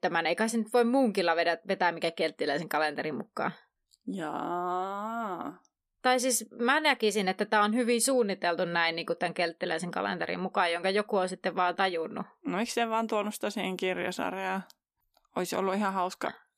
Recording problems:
none

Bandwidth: 14.5 kHz